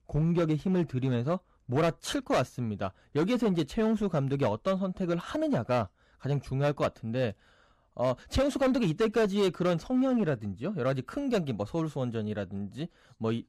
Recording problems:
distortion; slight; 6% of the sound clipped

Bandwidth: 14.5 kHz